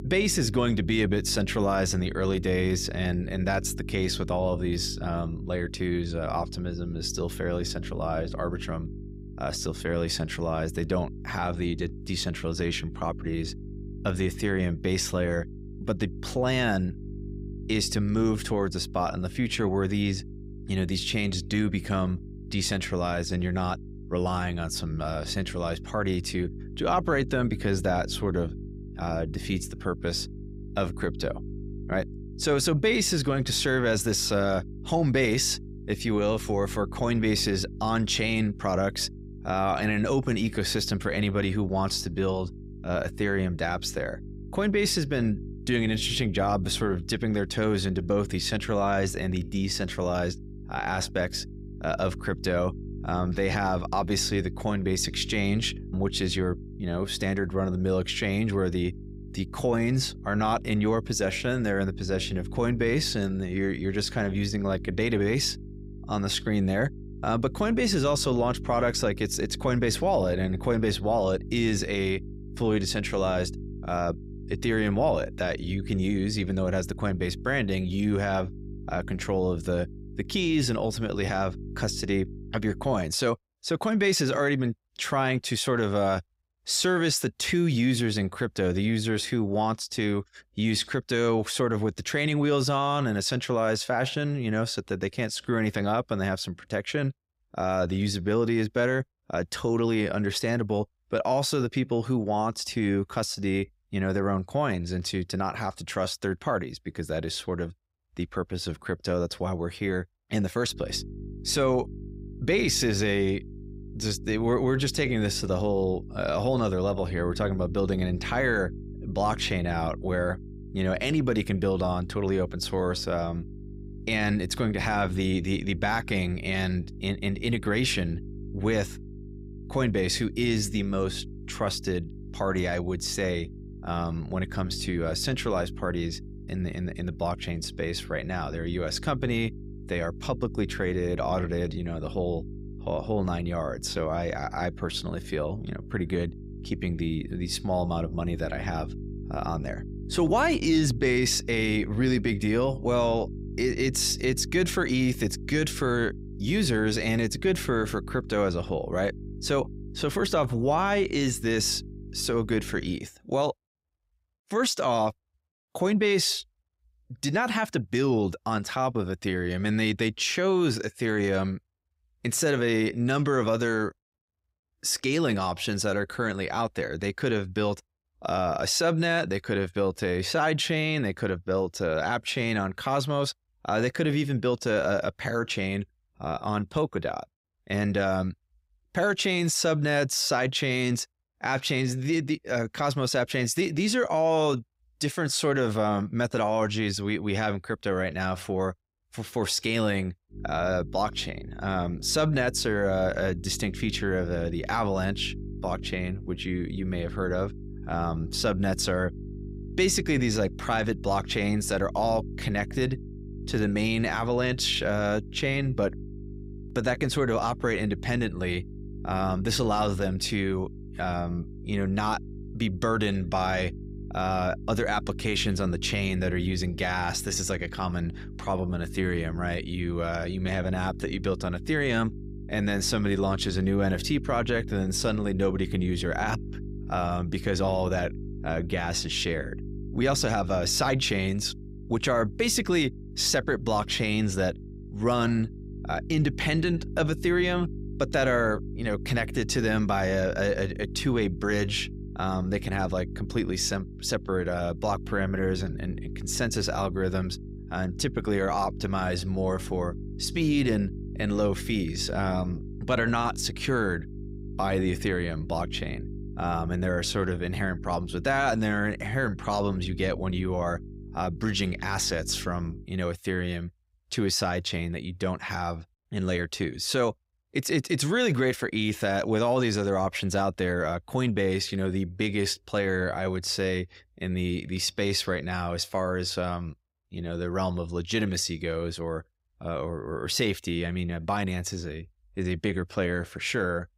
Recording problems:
electrical hum; noticeable; until 1:23, from 1:51 to 2:43 and from 3:20 to 4:33; 50 Hz, 20 dB below the speech

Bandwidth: 15.5 kHz